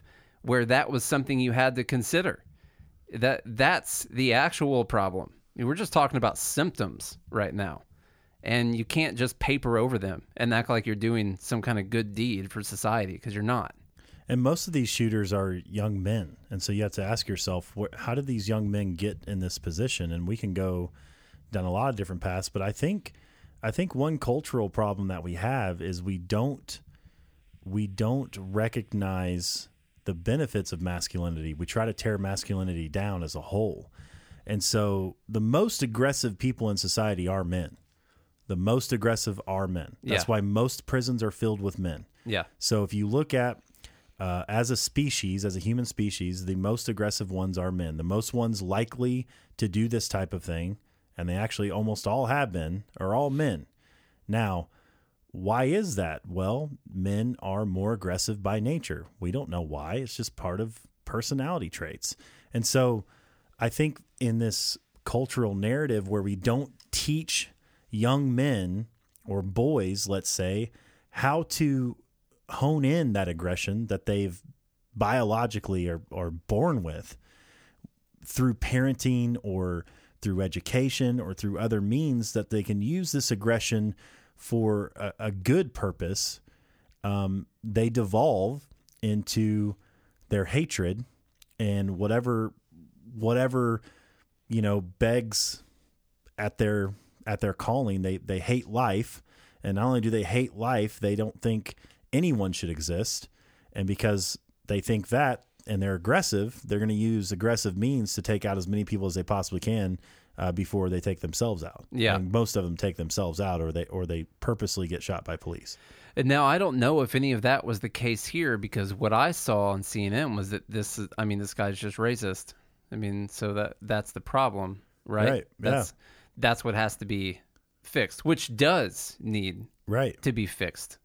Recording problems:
none

